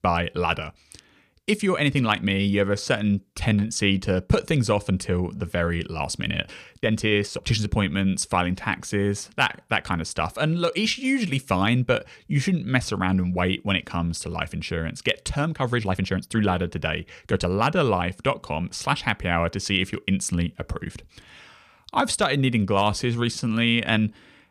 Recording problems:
uneven, jittery; strongly; from 1.5 to 24 s

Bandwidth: 15 kHz